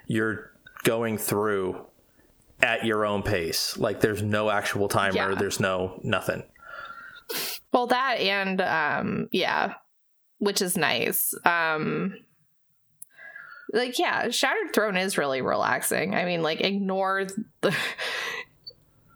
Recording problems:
squashed, flat; heavily

